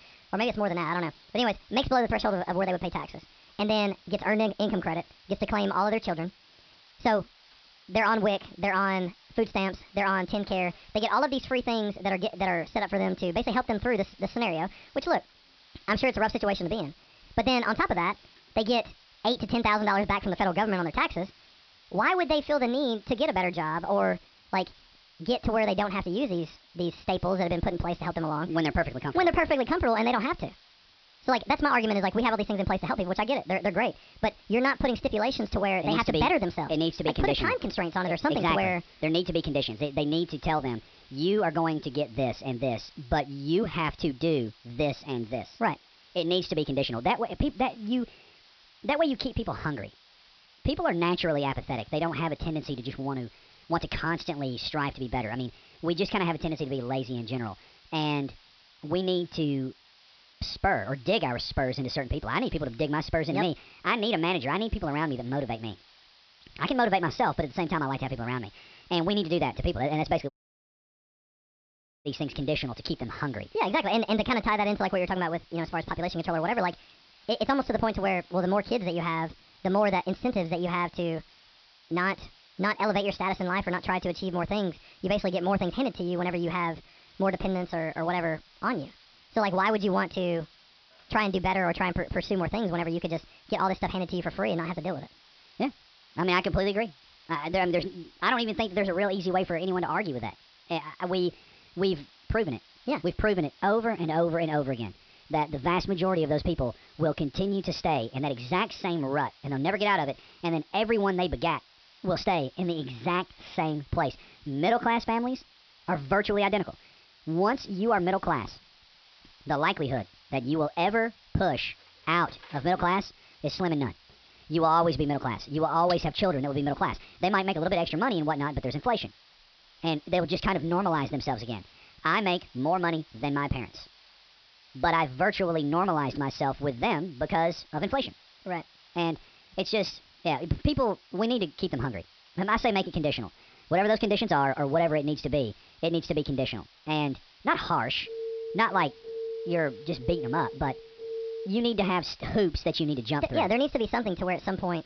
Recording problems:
wrong speed and pitch; too fast and too high; 1.5 times normal speed
high frequencies cut off; noticeable; nothing above 5.5 kHz
hiss; faint; throughout; 25 dB below the speech
audio cutting out; at 1:10 for 2 s
phone ringing; noticeable; from 2:28 to 2:31; peak 7 dB below the speech

